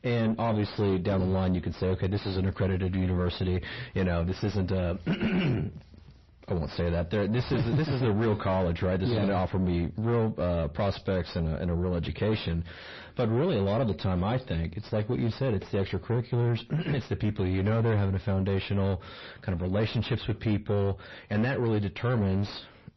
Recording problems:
distortion; heavy; 7 dB below the speech
garbled, watery; slightly; nothing above 5.5 kHz

